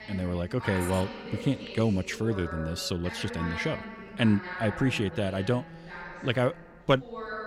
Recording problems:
voice in the background; noticeable; throughout; 10 dB below the speech
train or aircraft noise; faint; throughout; 30 dB below the speech

